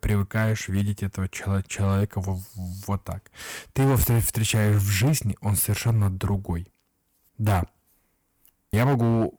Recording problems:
distortion; slight; 9% of the sound clipped

